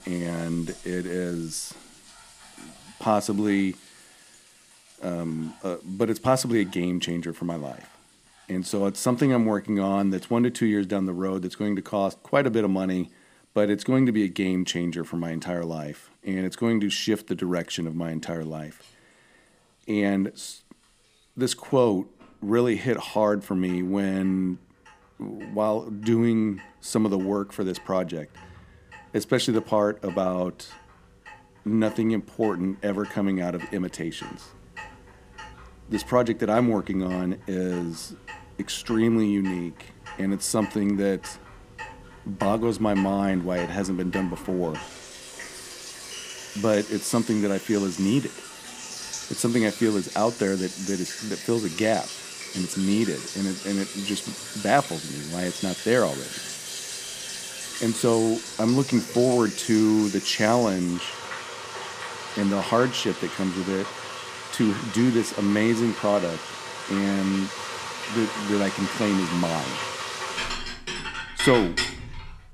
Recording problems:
household noises; loud; throughout; 9 dB below the speech

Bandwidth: 15 kHz